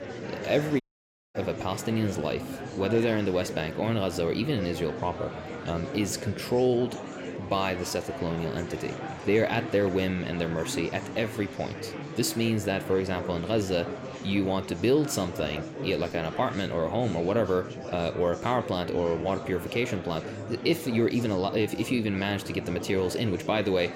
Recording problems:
murmuring crowd; loud; throughout; 9 dB below the speech
audio cutting out; at 1 s for 0.5 s

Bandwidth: 16 kHz